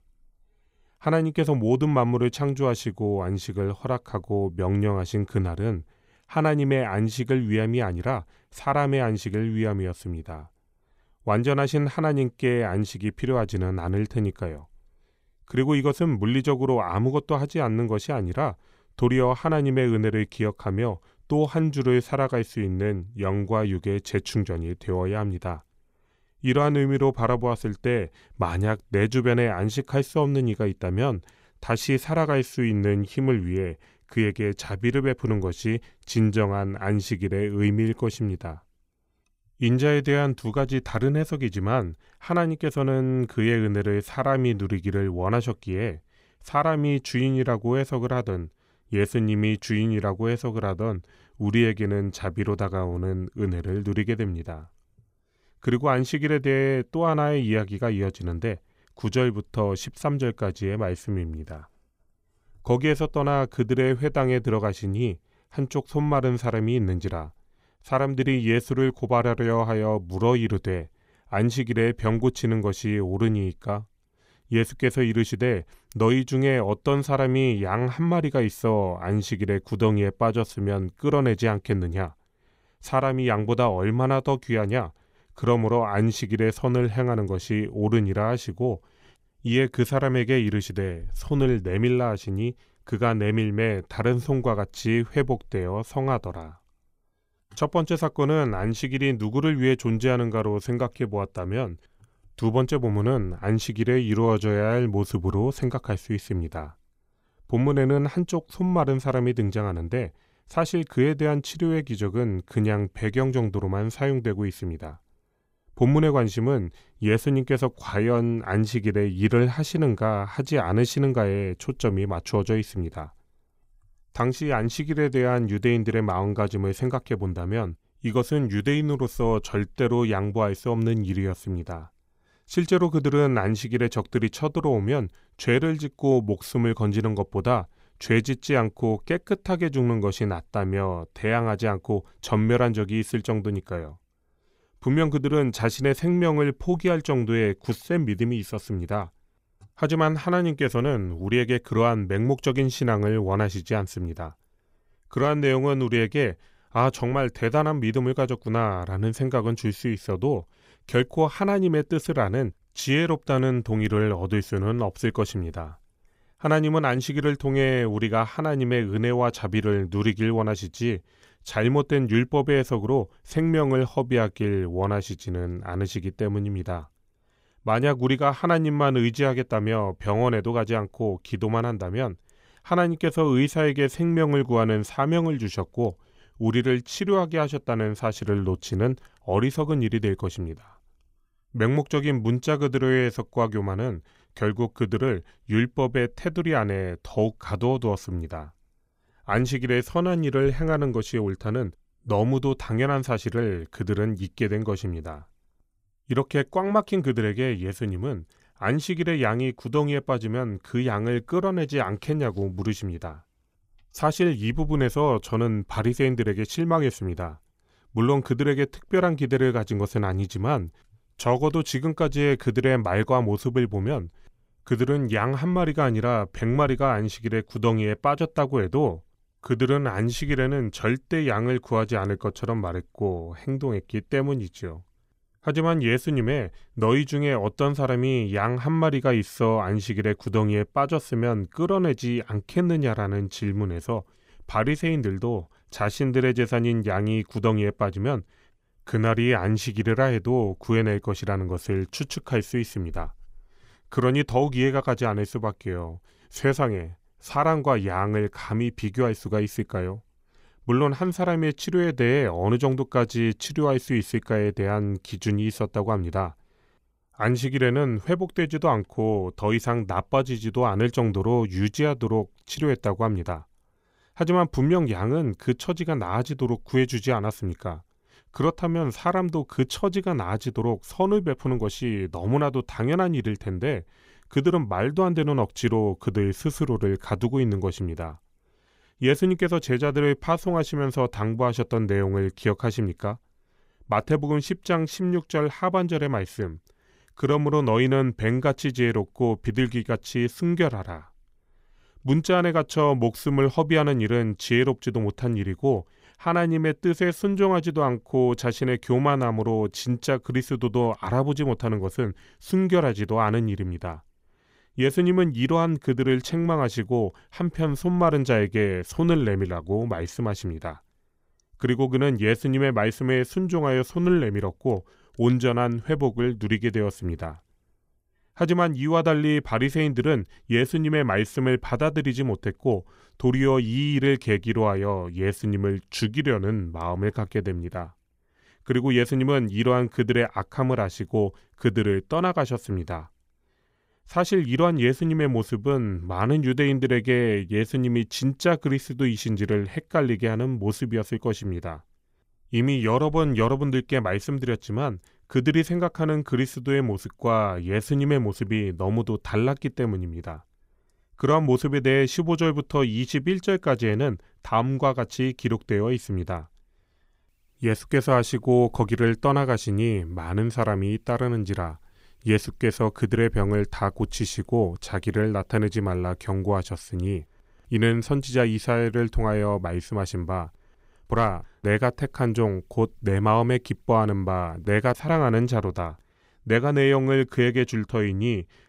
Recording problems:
none

